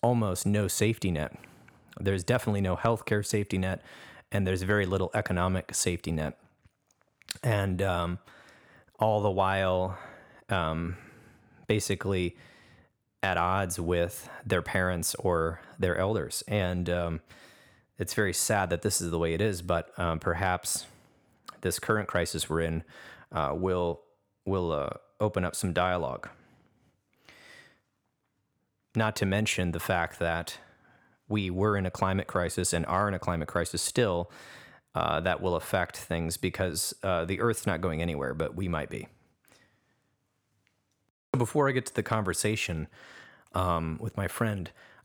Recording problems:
none

